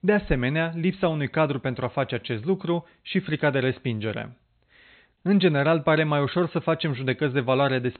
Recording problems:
high frequencies cut off; severe; nothing above 4 kHz

